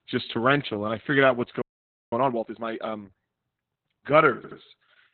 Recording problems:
garbled, watery; badly; nothing above 4 kHz
audio freezing; at 1.5 s for 0.5 s
audio stuttering; at 4.5 s

